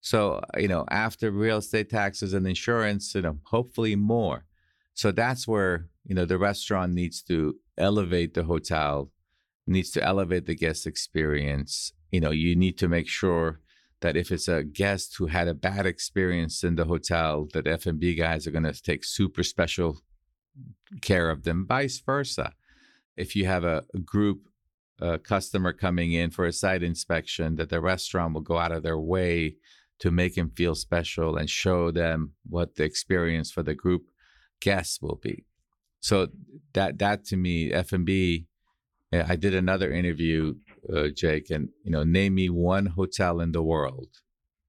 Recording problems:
none

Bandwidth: 18.5 kHz